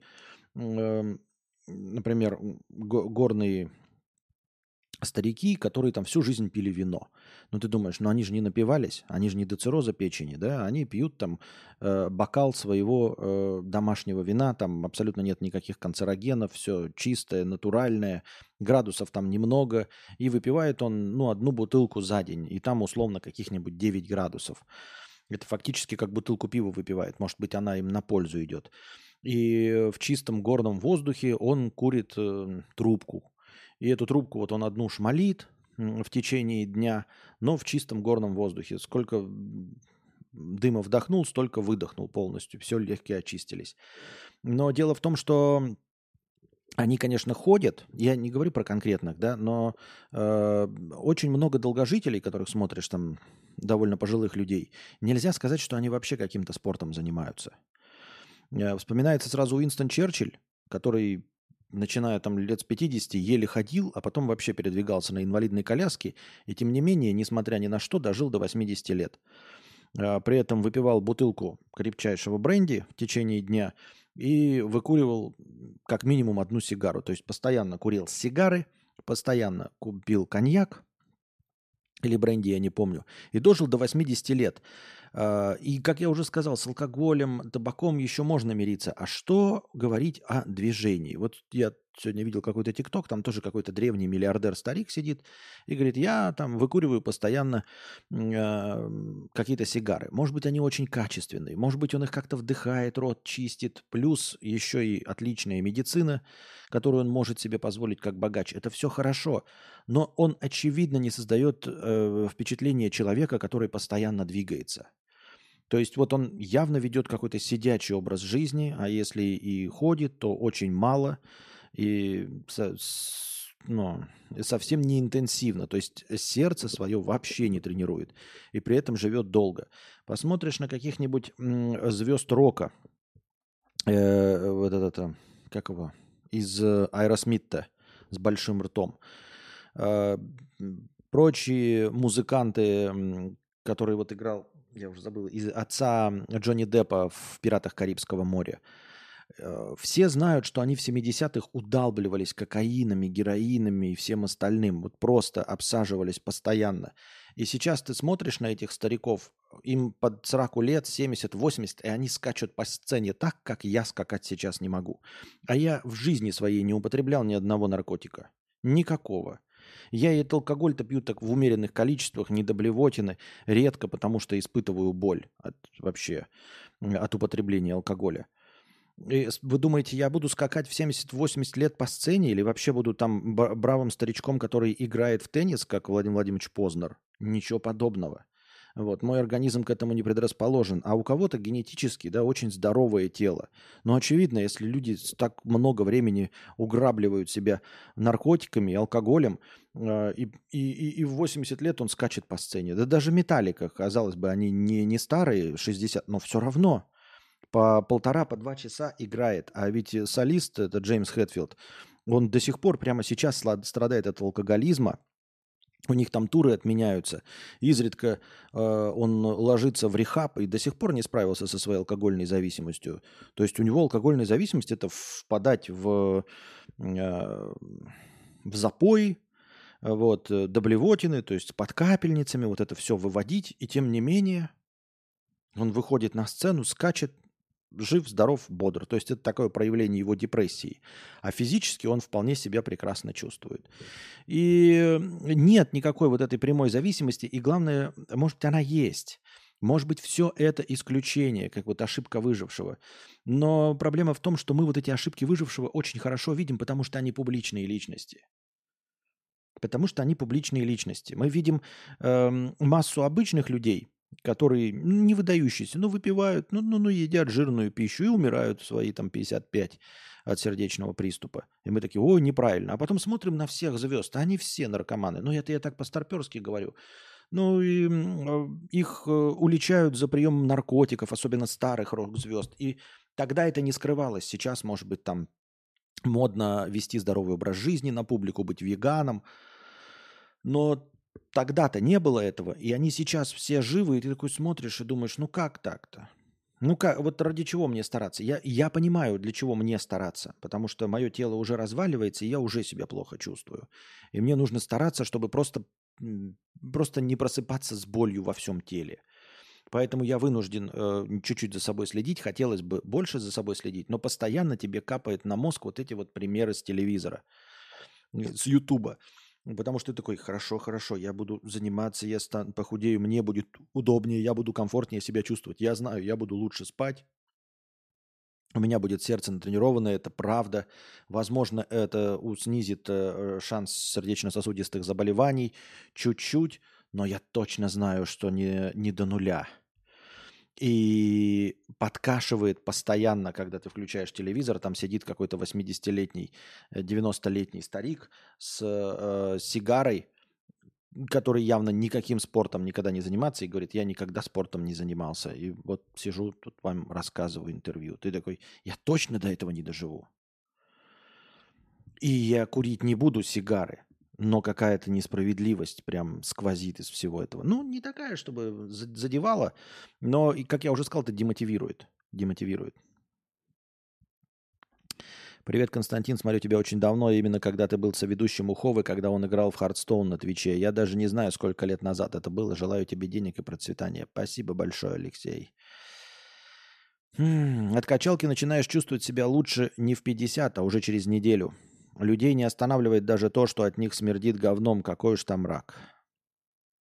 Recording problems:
none

